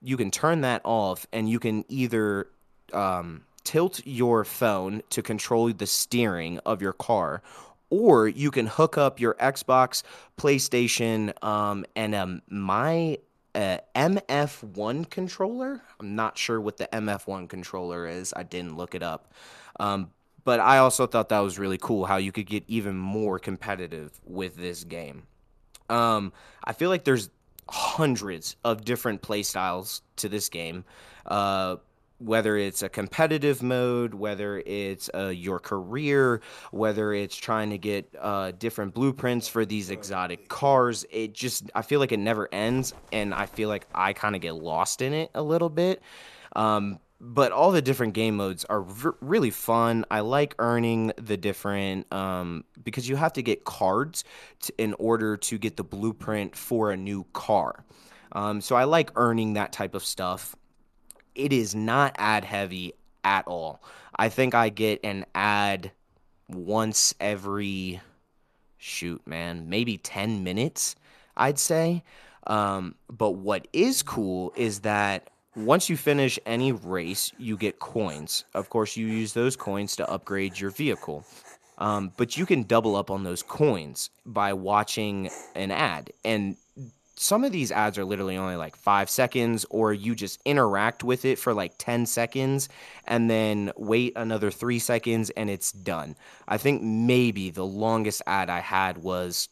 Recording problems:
animal sounds; faint; throughout; 30 dB below the speech

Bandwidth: 13.5 kHz